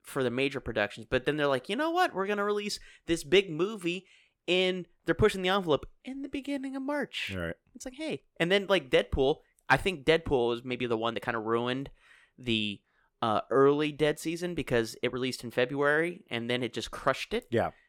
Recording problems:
uneven, jittery; strongly; from 1 to 16 s

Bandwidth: 17.5 kHz